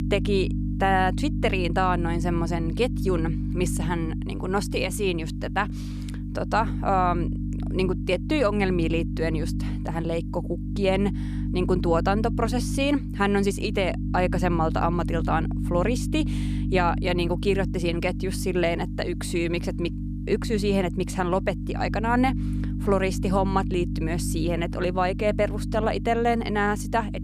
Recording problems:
electrical hum; noticeable; throughout; 50 Hz, 10 dB below the speech

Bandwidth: 14.5 kHz